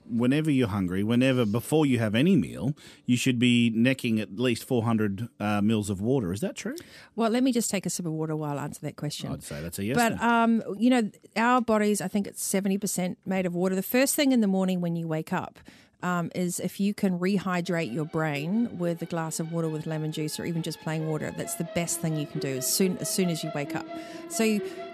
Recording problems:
background music; noticeable; throughout; 15 dB below the speech

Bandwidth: 14 kHz